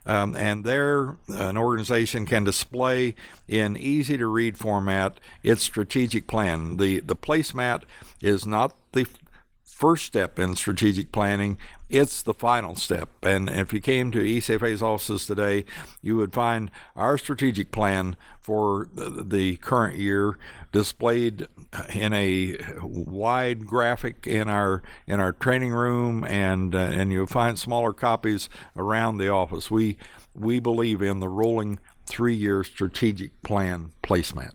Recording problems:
garbled, watery; slightly; nothing above 19.5 kHz

